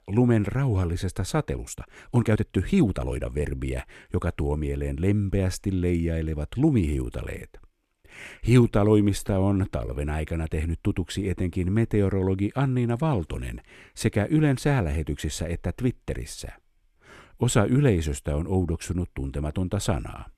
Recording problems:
uneven, jittery; strongly; from 1.5 to 10 s

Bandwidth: 14 kHz